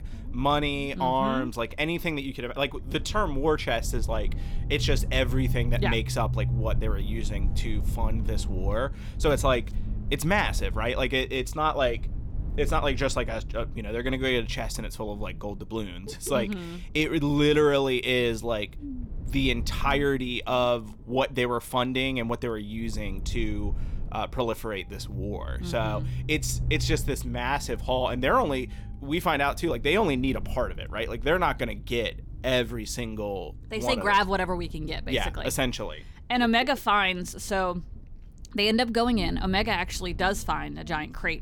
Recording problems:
low rumble; faint; throughout; 20 dB below the speech

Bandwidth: 17.5 kHz